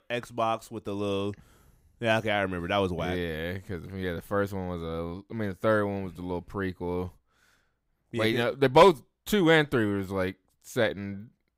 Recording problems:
none

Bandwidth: 15.5 kHz